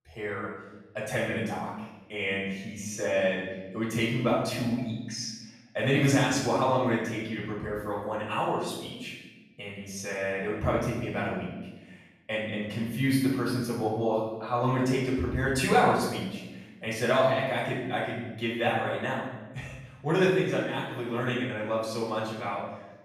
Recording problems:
off-mic speech; far
room echo; noticeable; dies away in 0.9 s

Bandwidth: 14.5 kHz